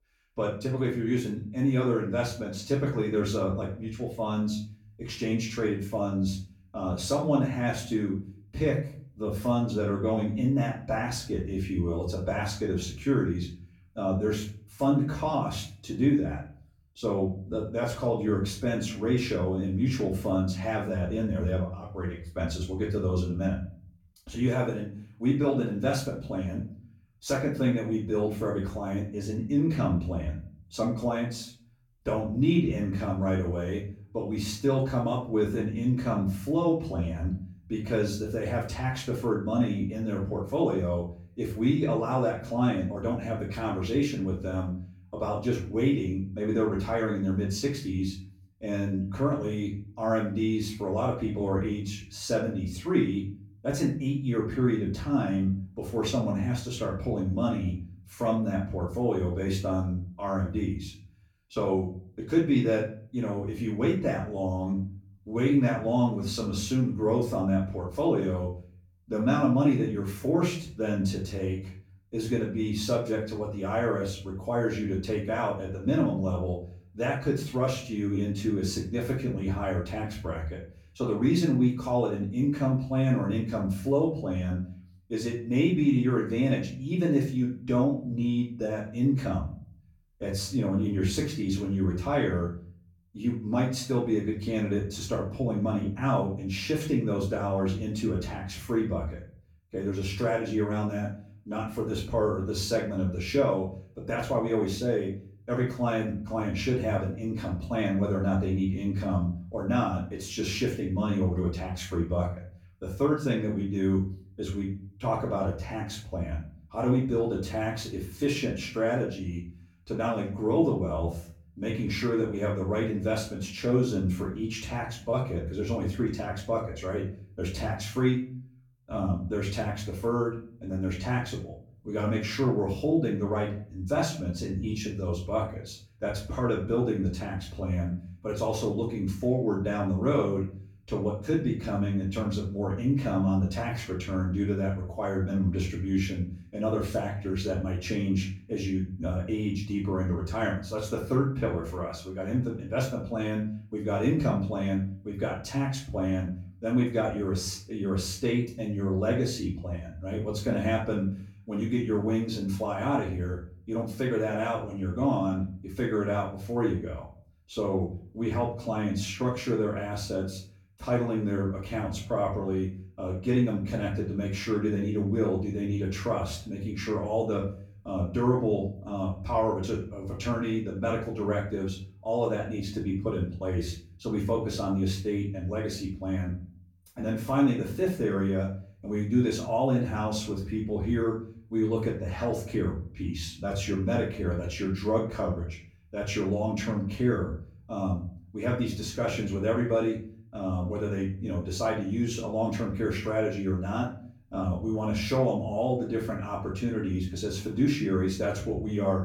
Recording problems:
off-mic speech; far
room echo; slight; dies away in 0.4 s

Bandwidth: 18 kHz